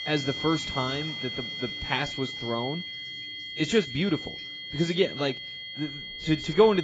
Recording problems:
garbled, watery; badly; nothing above 7.5 kHz
high-pitched whine; loud; throughout; 3 kHz, 6 dB below the speech
household noises; faint; throughout; 20 dB below the speech
abrupt cut into speech; at the end

